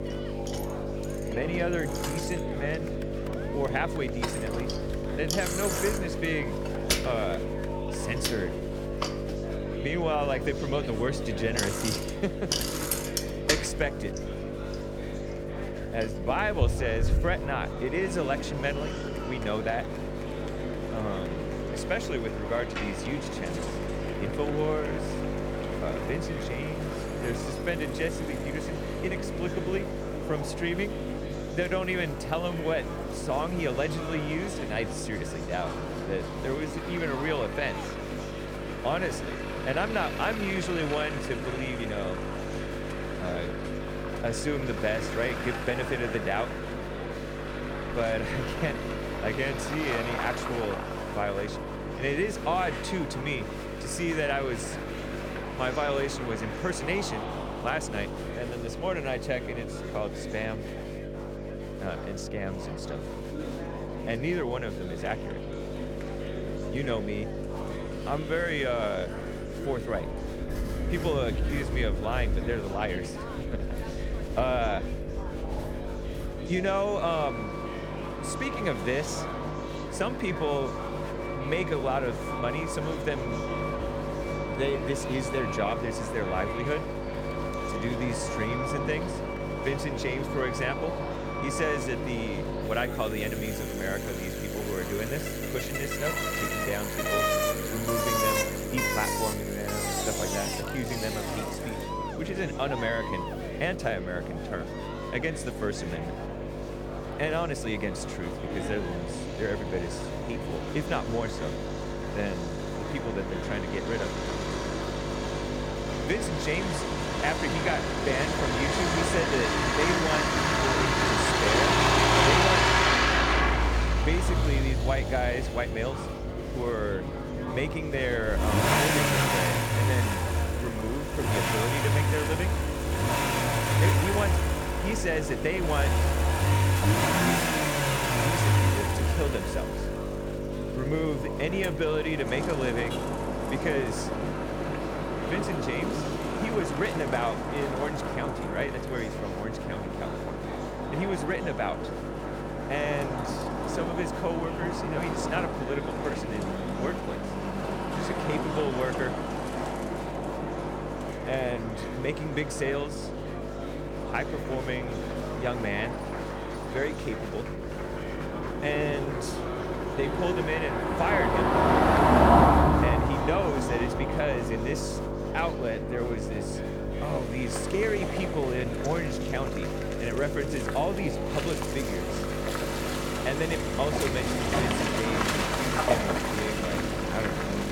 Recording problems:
traffic noise; very loud; throughout; 2 dB above the speech
electrical hum; loud; throughout; 50 Hz, 6 dB below the speech
murmuring crowd; loud; throughout; 9 dB below the speech

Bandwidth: 18 kHz